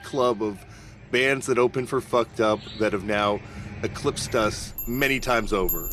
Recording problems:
household noises; loud; throughout; 9 dB below the speech
animal sounds; noticeable; throughout; 15 dB below the speech

